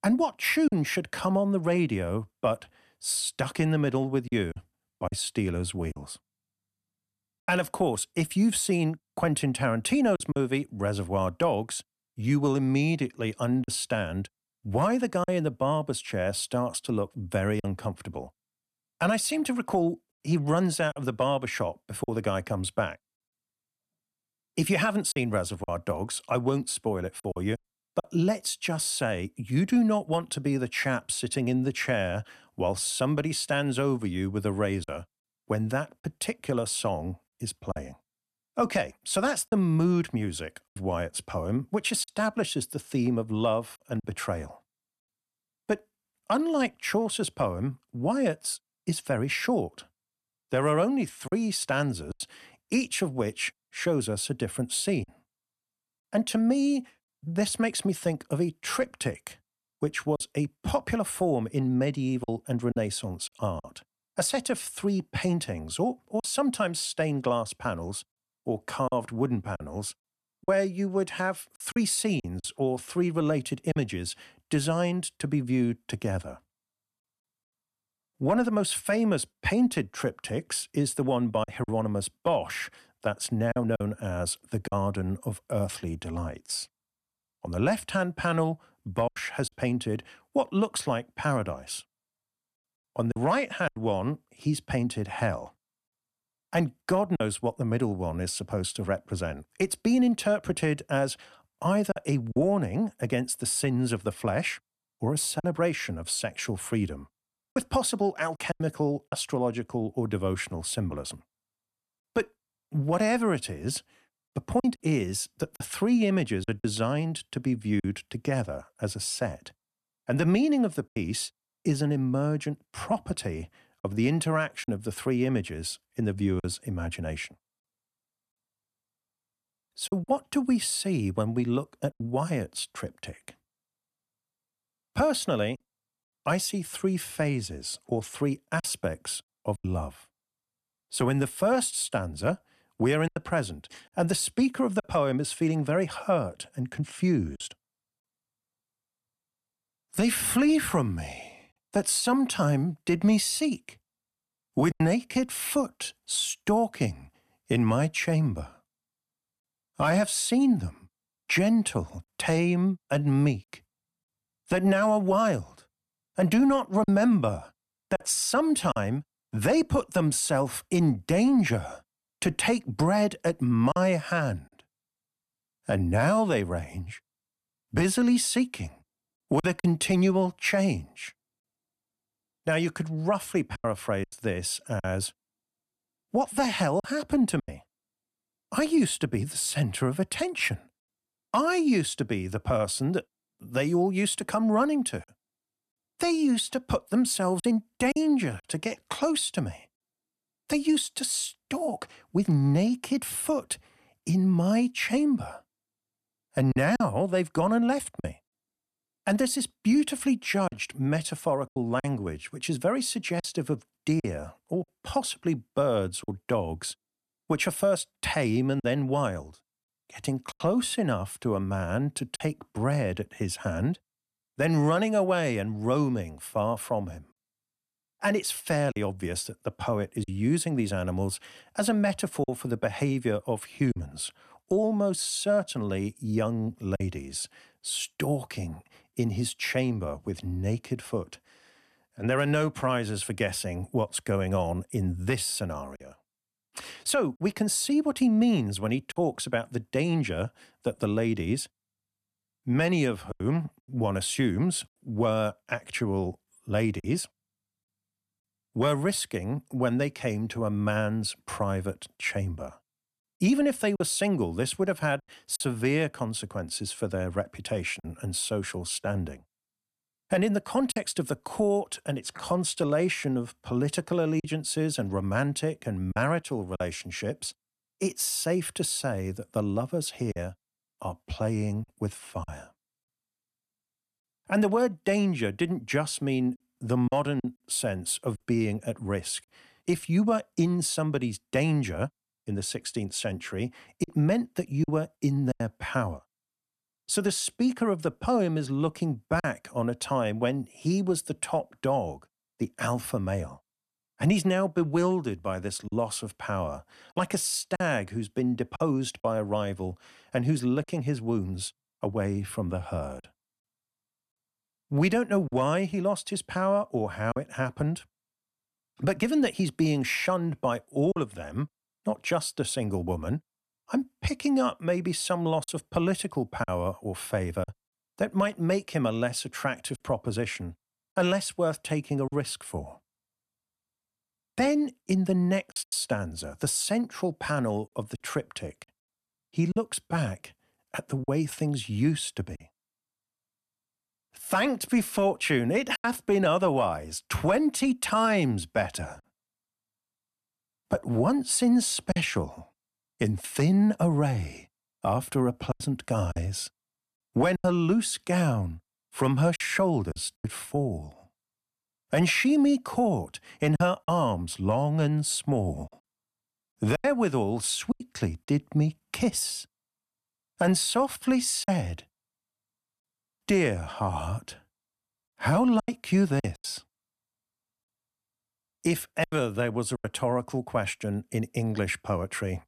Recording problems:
choppy; occasionally; 3% of the speech affected

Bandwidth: 13.5 kHz